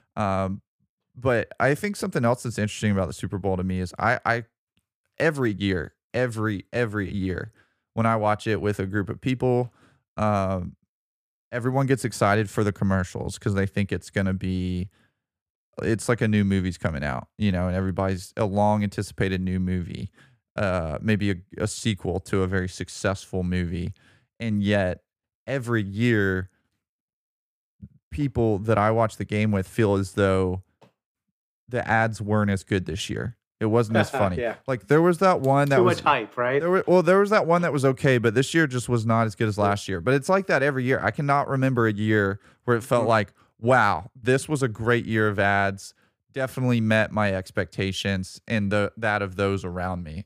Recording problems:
none

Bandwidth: 15 kHz